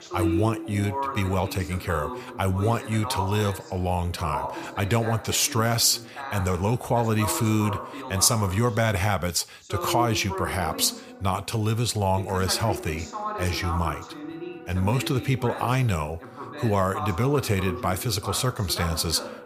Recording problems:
voice in the background; loud; throughout; 9 dB below the speech
background music; faint; throughout; 25 dB below the speech

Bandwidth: 15 kHz